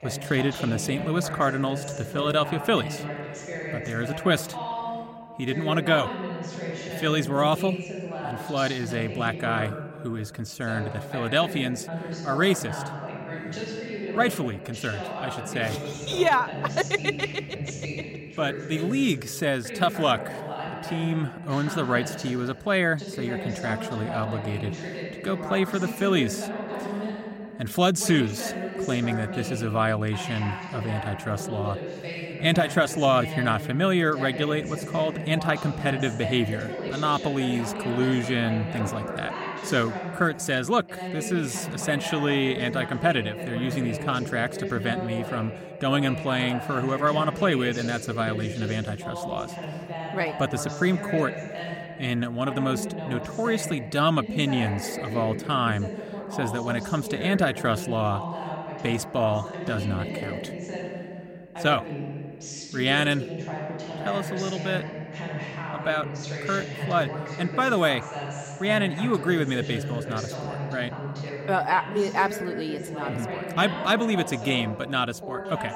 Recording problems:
voice in the background; loud; throughout; 7 dB below the speech

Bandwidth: 16 kHz